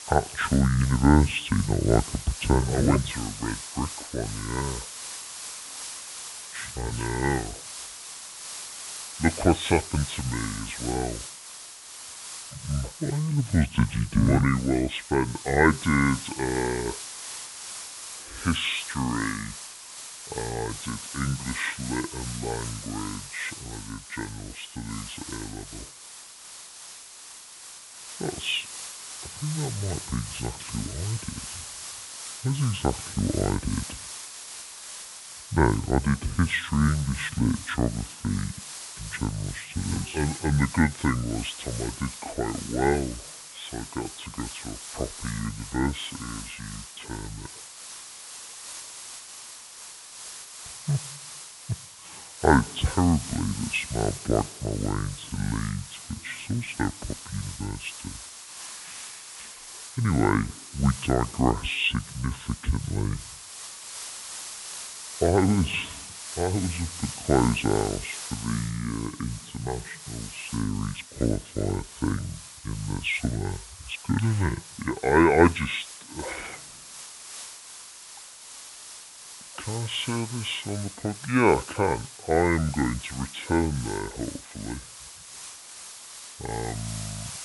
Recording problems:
high frequencies cut off; severe; nothing above 4 kHz
wrong speed and pitch; too slow and too low; 0.6 times normal speed
hiss; noticeable; throughout; 10 dB below the speech

